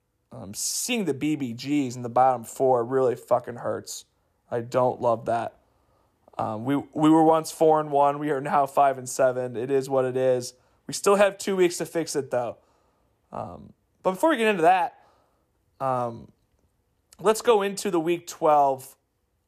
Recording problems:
none

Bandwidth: 14.5 kHz